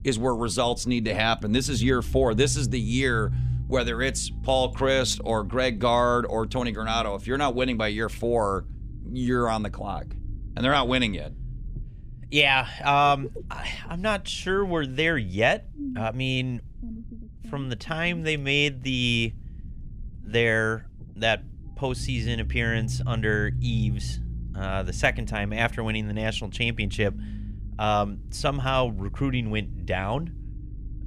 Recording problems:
low rumble; faint; throughout; 25 dB below the speech

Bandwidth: 14.5 kHz